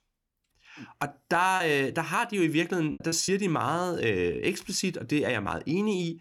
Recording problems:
choppy; very; from 1.5 to 3.5 s; 9% of the speech affected

